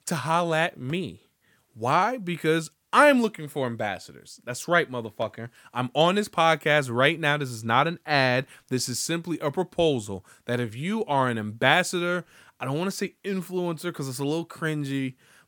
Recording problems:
none

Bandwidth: 18 kHz